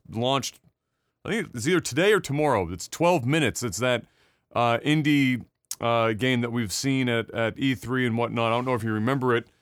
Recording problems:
none

